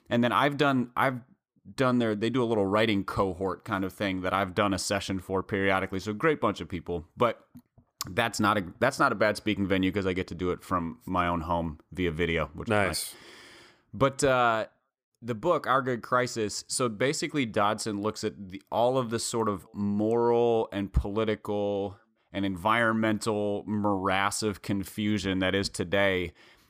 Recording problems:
none

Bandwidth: 15 kHz